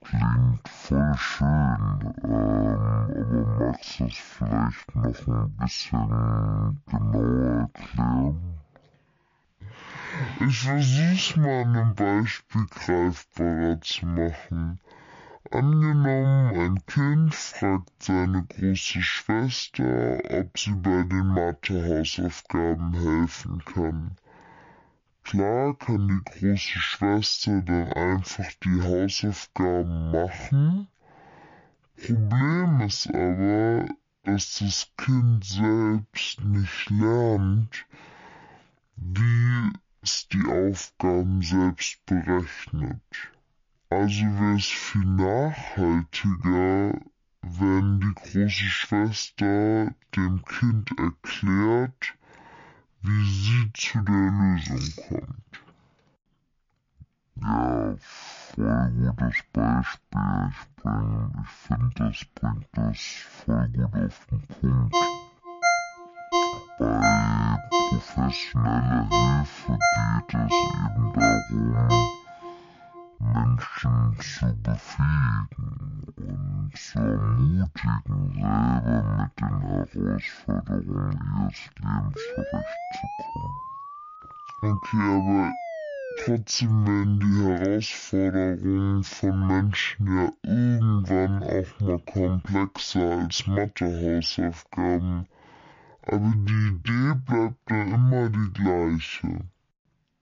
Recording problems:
wrong speed and pitch; too slow and too low; 0.5 times normal speed
jangling keys; faint; at 55 s; peak 10 dB below the speech
phone ringing; loud; from 1:05 to 1:12; peak 2 dB above the speech
siren; noticeable; from 1:22 to 1:26; peak 9 dB below the speech

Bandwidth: 7 kHz